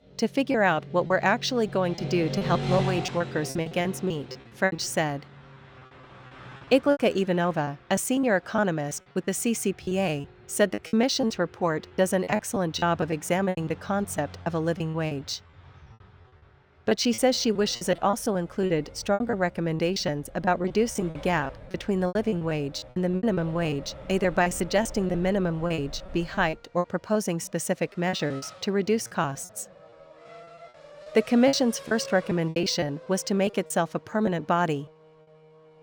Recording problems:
traffic noise; noticeable; throughout; 15 dB below the speech
choppy; very; 13% of the speech affected

